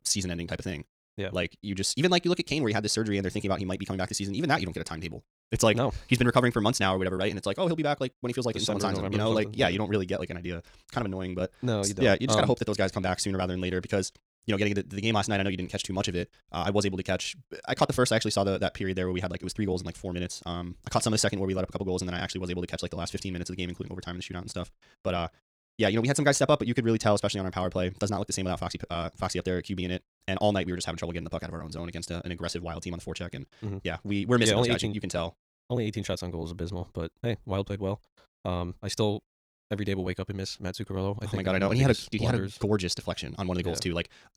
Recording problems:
wrong speed, natural pitch; too fast; 1.5 times normal speed

